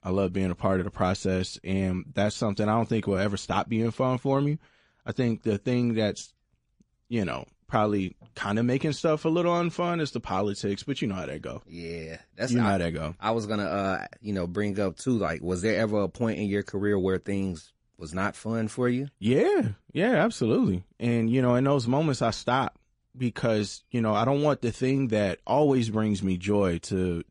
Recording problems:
garbled, watery; slightly; nothing above 10.5 kHz

